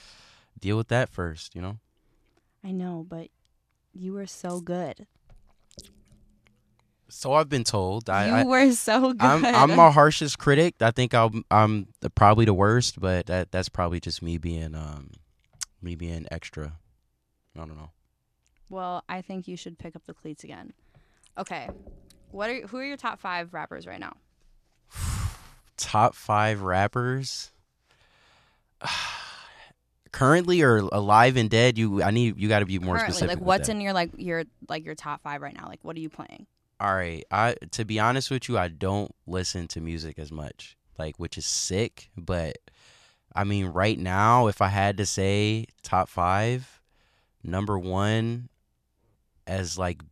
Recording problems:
none

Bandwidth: 14 kHz